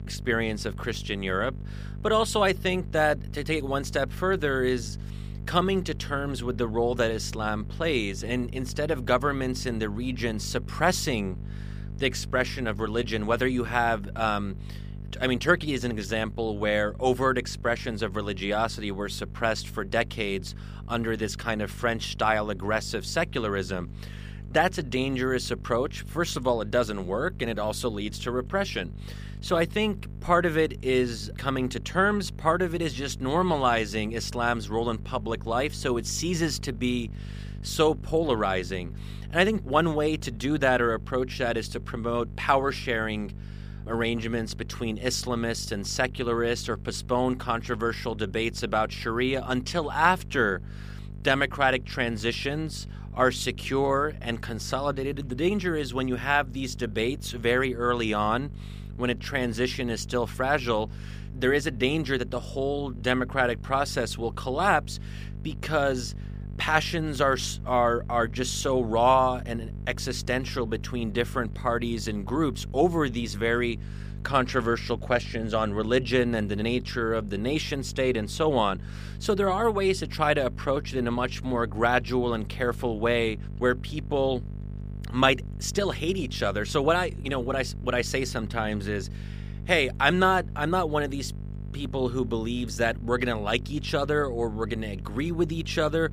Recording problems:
electrical hum; faint; throughout; 50 Hz, 25 dB below the speech

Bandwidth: 15 kHz